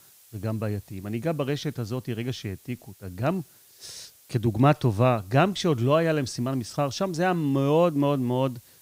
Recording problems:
hiss; faint; throughout; 25 dB below the speech

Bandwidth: 15.5 kHz